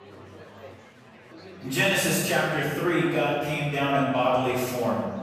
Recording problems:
room echo; strong; dies away in 1.4 s
off-mic speech; far
murmuring crowd; faint; throughout; 20 dB below the speech

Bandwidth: 14.5 kHz